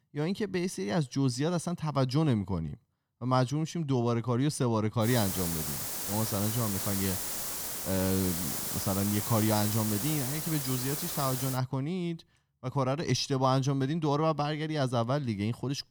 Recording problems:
hiss; loud; from 5 to 12 s; 1 dB below the speech

